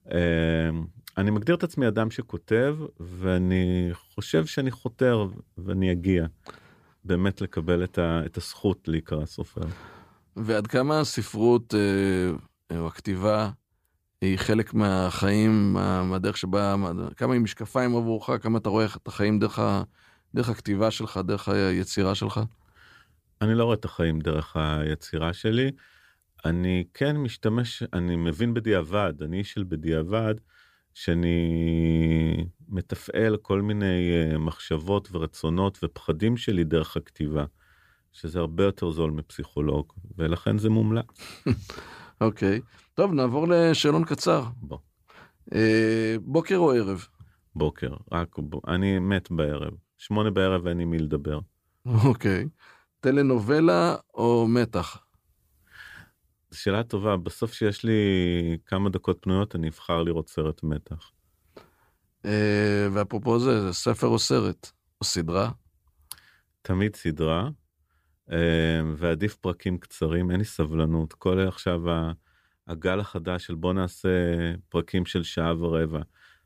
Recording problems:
none

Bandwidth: 15 kHz